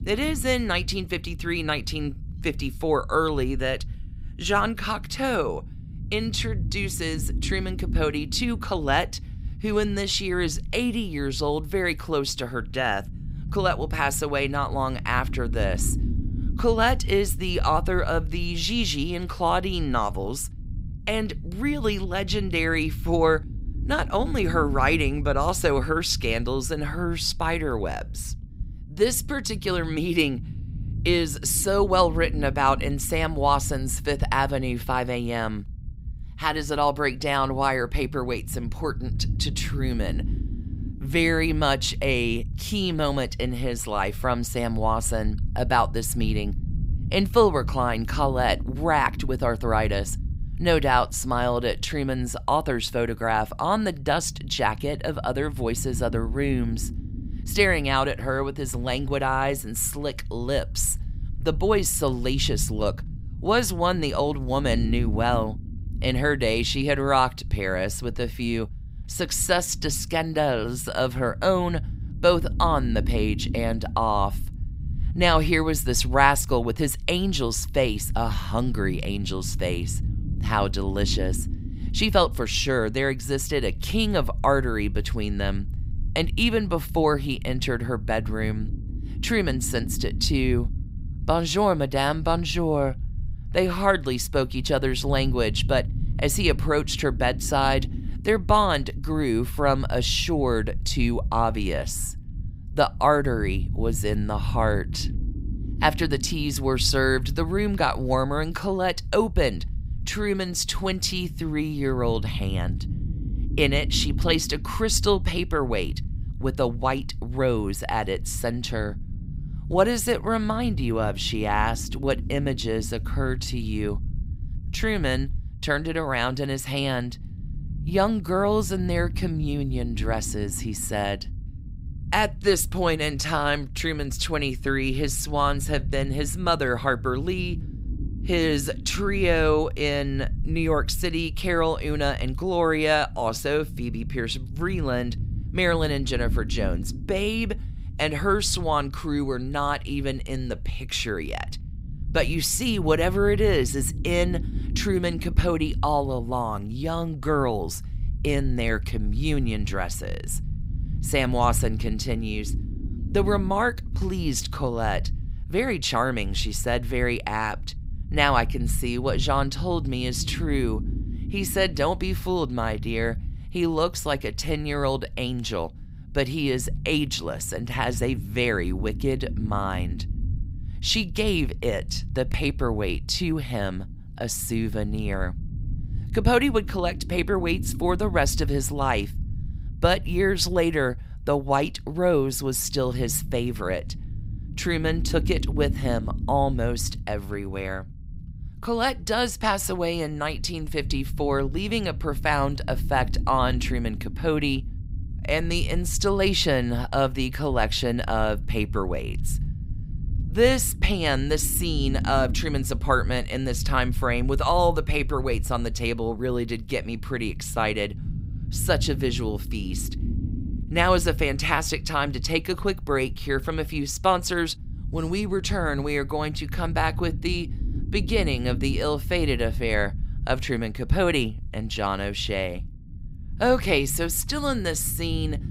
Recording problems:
low rumble; faint; throughout; 20 dB below the speech

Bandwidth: 15.5 kHz